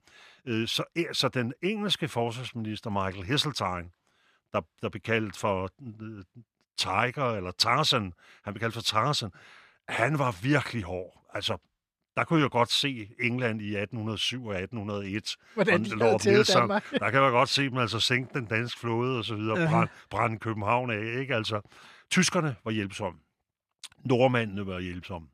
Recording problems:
none

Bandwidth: 14.5 kHz